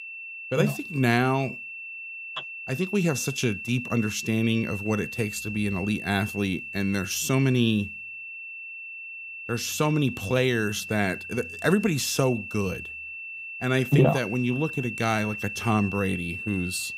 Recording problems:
high-pitched whine; loud; throughout; 2.5 kHz, 9 dB below the speech

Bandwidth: 15.5 kHz